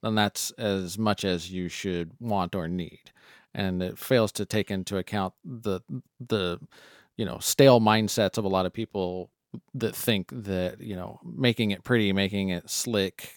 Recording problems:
none

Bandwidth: 18 kHz